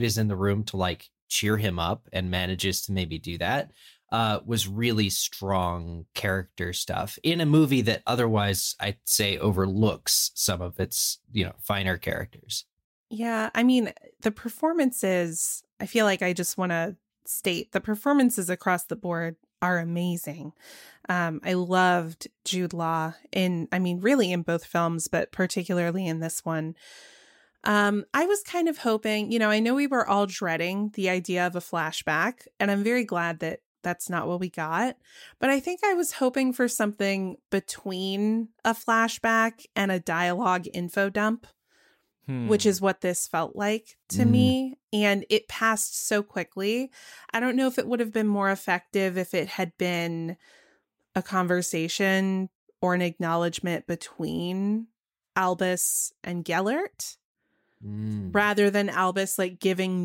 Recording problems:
abrupt cut into speech; at the start and the end

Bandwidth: 16 kHz